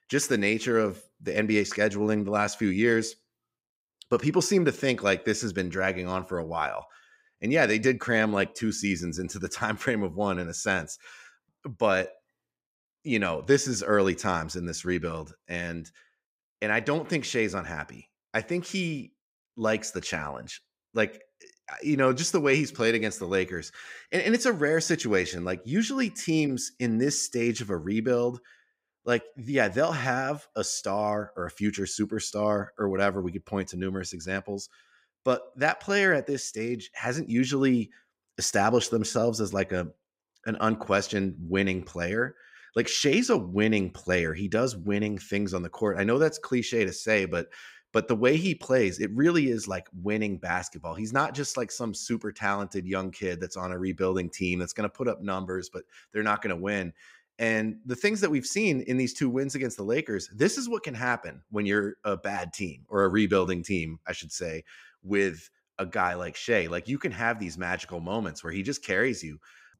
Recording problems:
none

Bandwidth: 15.5 kHz